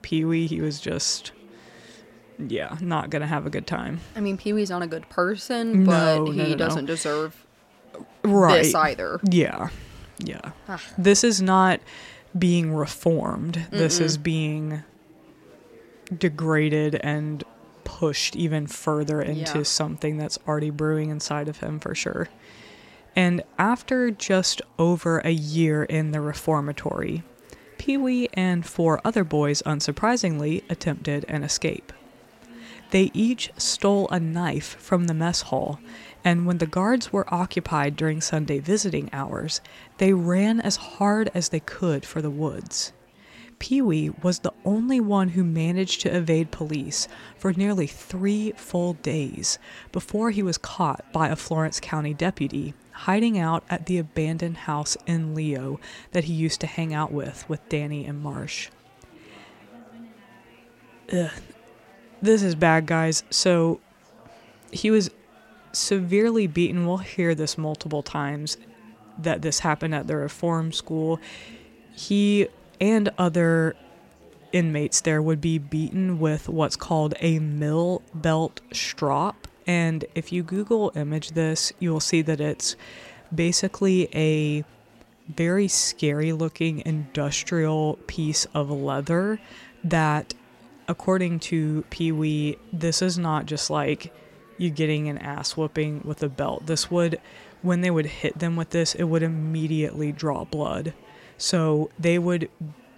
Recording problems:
chatter from many people; faint; throughout; 25 dB below the speech

